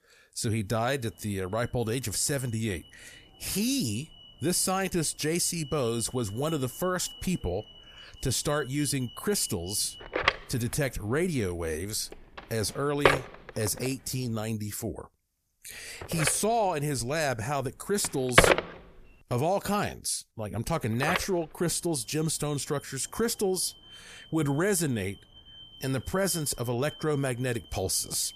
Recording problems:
alarms or sirens; very loud; throughout; as loud as the speech

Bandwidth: 14.5 kHz